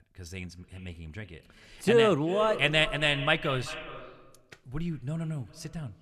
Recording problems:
echo of what is said; strong; throughout; 390 ms later, 10 dB below the speech

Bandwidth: 13.5 kHz